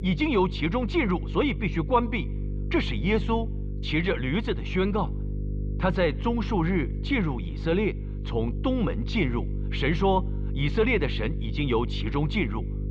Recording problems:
muffled; very; fading above 3 kHz
electrical hum; noticeable; throughout; 50 Hz, 15 dB below the speech

